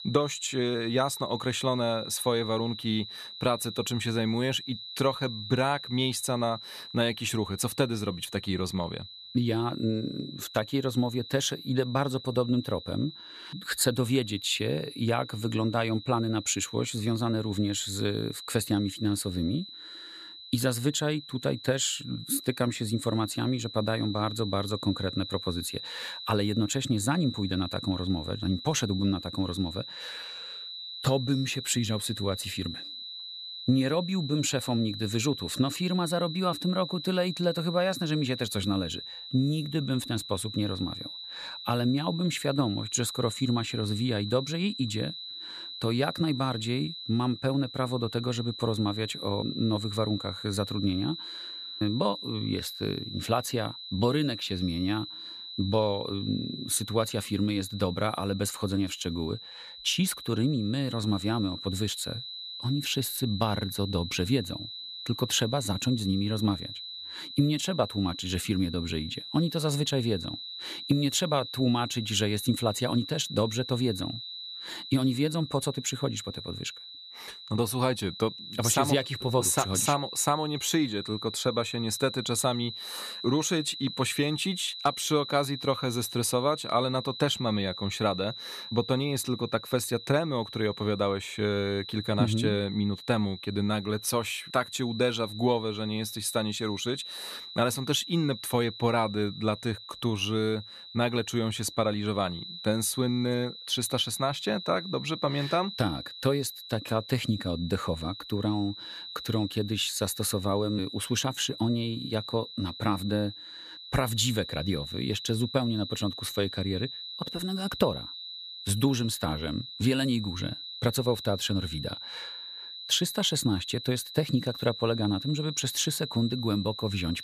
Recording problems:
high-pitched whine; loud; throughout; 4 kHz, 10 dB below the speech

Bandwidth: 14.5 kHz